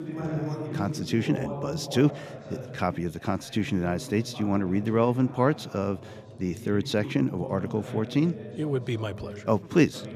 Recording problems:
voice in the background; noticeable; throughout; 10 dB below the speech

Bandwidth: 14.5 kHz